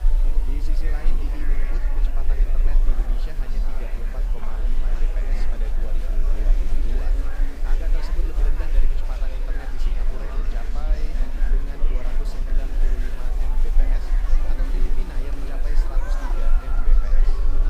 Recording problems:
echo of what is said; faint; throughout; 480 ms later, 20 dB below the speech
murmuring crowd; very loud; throughout; 2 dB above the speech
low rumble; loud; throughout; 10 dB below the speech
hiss; noticeable; throughout; 15 dB below the speech

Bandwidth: 15.5 kHz